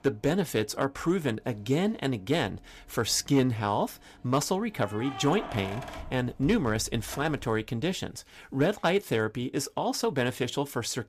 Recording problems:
household noises; noticeable; throughout; 15 dB below the speech

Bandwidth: 14.5 kHz